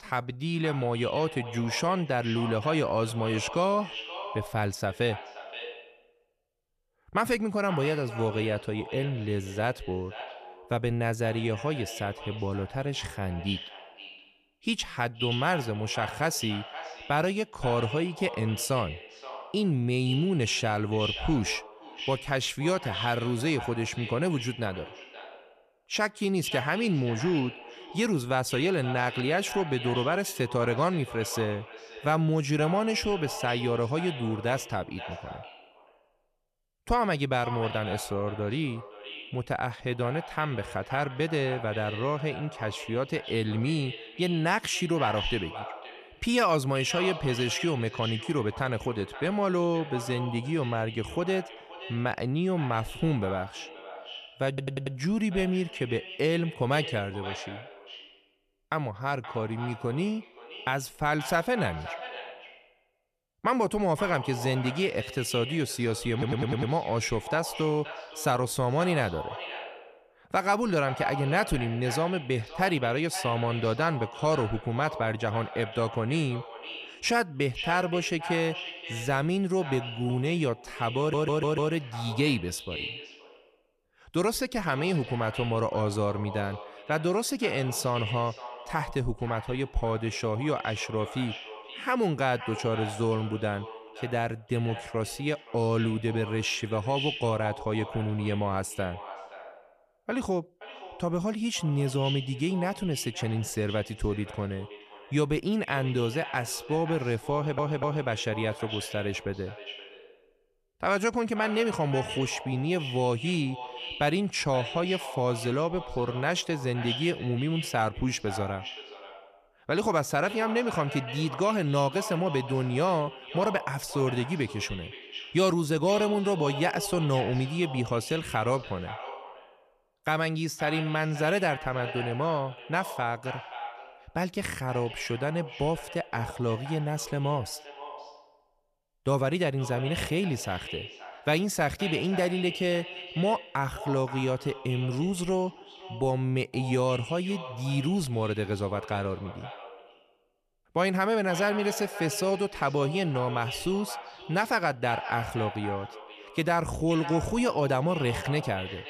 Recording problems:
echo of what is said; strong; throughout; 520 ms later, 10 dB below the speech
audio stuttering; 4 times, first at 54 s

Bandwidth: 14.5 kHz